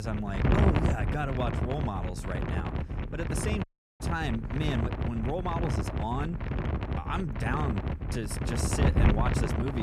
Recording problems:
wind noise on the microphone; heavy; 1 dB below the speech
abrupt cut into speech; at the start and the end
audio cutting out; at 3.5 s

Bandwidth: 14 kHz